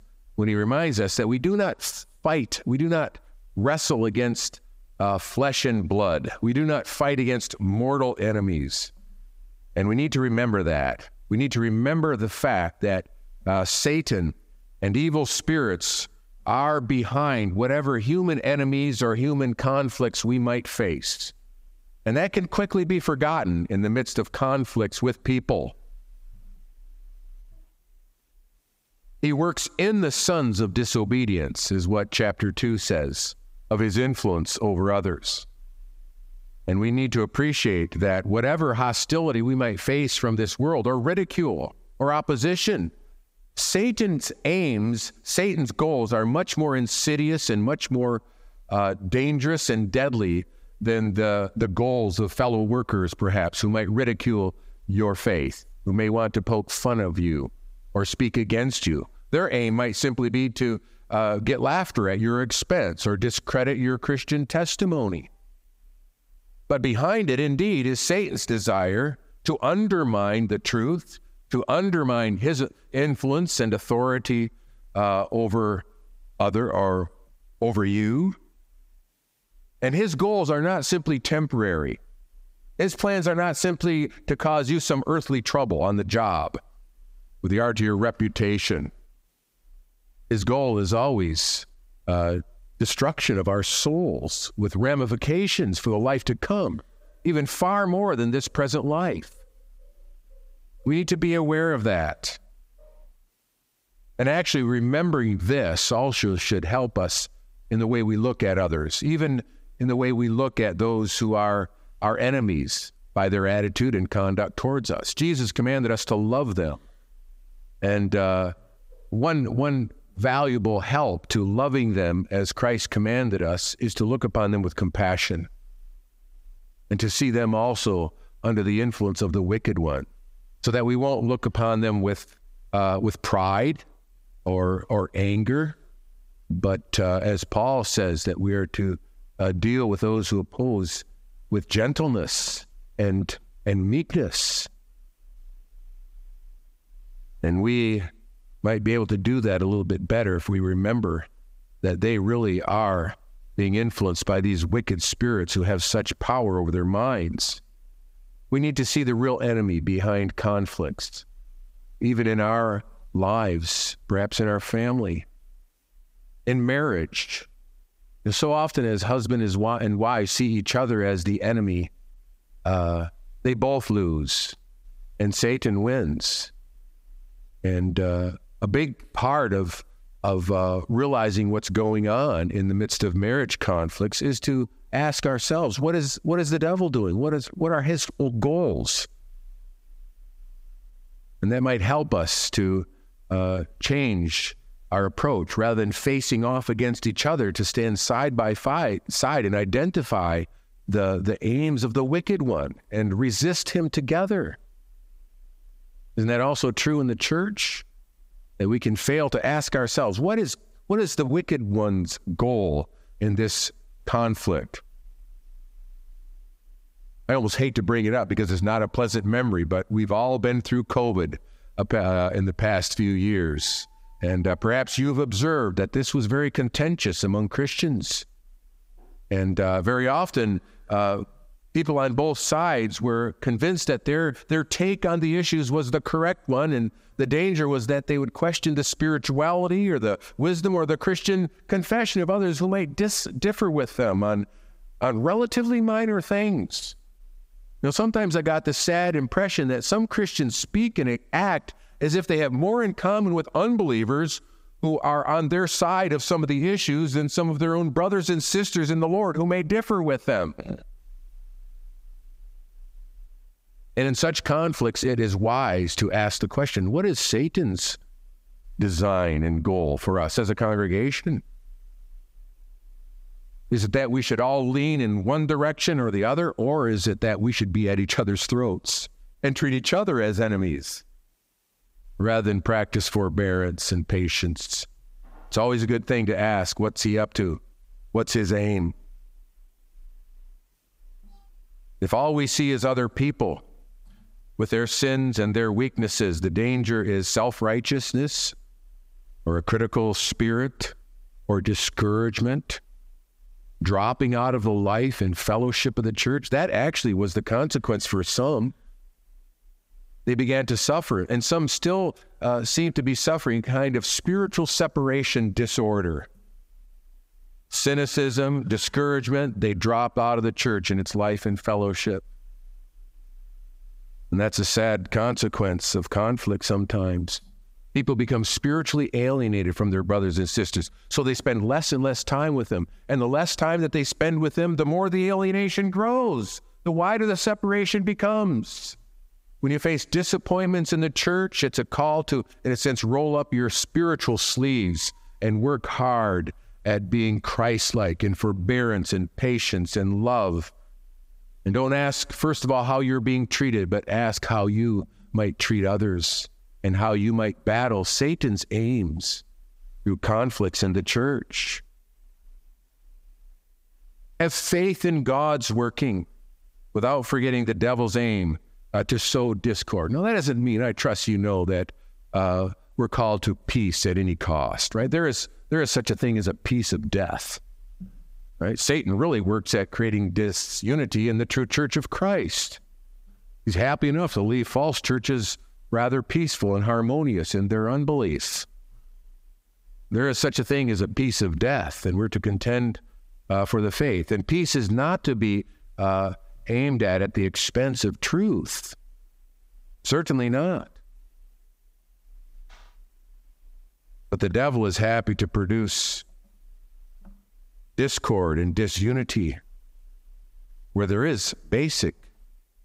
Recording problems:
squashed, flat; heavily

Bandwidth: 15.5 kHz